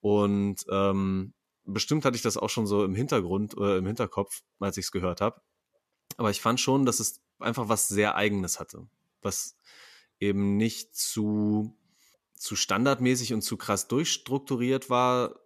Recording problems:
none

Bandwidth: 14 kHz